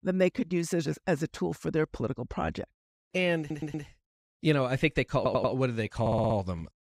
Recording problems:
audio stuttering; at 3.5 s, at 5 s and at 6 s

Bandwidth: 15.5 kHz